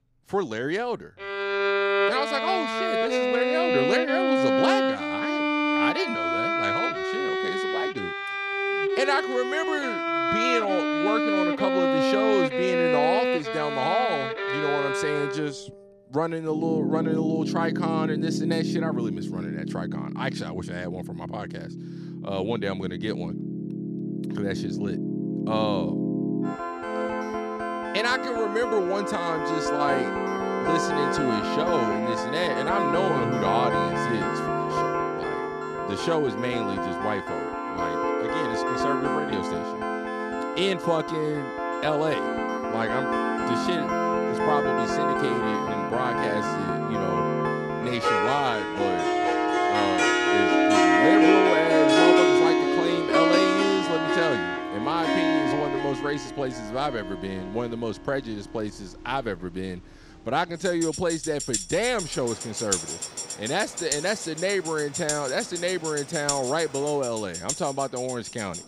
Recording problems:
background music; very loud; throughout; 3 dB above the speech
train or aircraft noise; faint; from 48 s on; 20 dB below the speech

